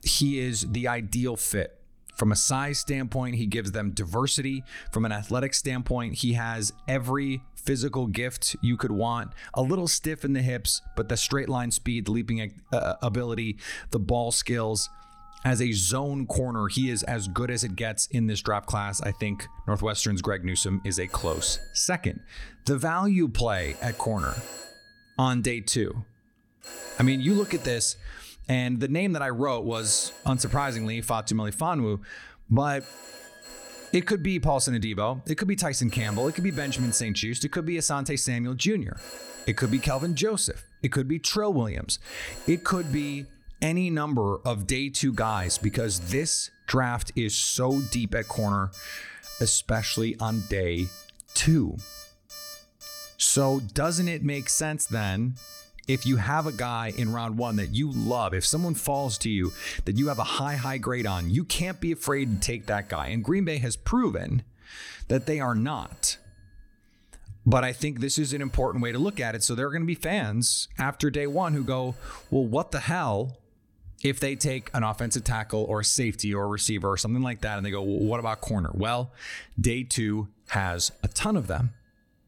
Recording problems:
alarms or sirens; noticeable; throughout; 20 dB below the speech

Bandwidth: 18 kHz